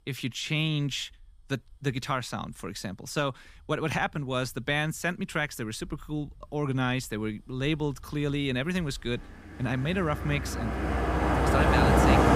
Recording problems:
traffic noise; very loud; throughout; 5 dB above the speech

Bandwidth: 15 kHz